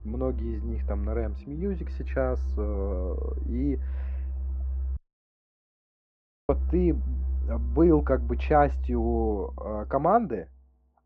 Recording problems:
muffled; very; fading above 1.5 kHz
background music; loud; throughout; 4 dB below the speech
audio cutting out; at 5 s for 1.5 s

